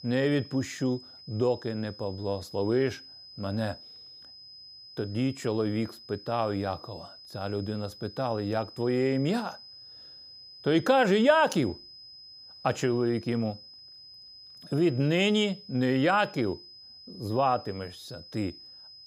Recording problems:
high-pitched whine; noticeable; throughout; 5 kHz, 20 dB below the speech

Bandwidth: 15.5 kHz